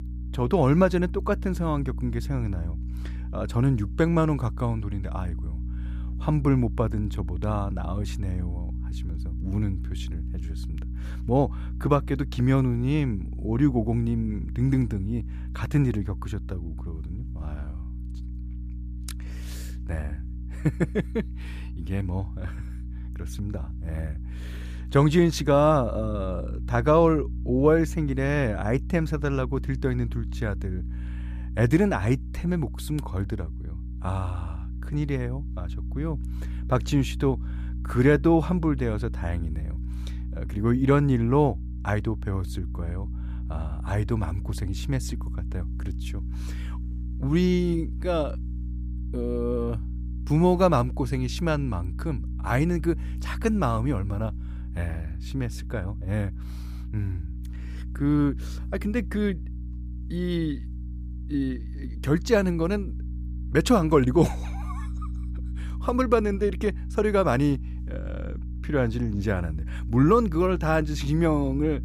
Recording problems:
electrical hum; faint; throughout; 60 Hz, 20 dB below the speech

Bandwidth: 14.5 kHz